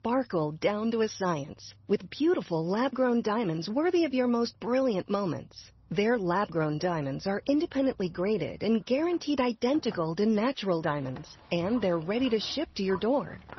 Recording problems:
garbled, watery; slightly; nothing above 6 kHz
animal sounds; faint; throughout; 25 dB below the speech

